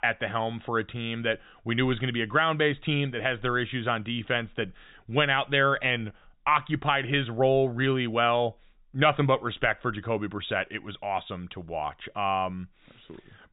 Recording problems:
high frequencies cut off; severe; nothing above 4 kHz

